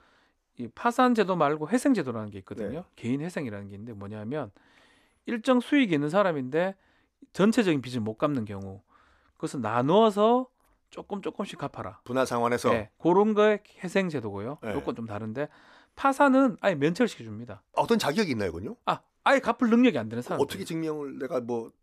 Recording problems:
none

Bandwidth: 14.5 kHz